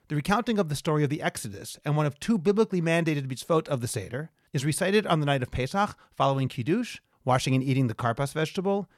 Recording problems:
none

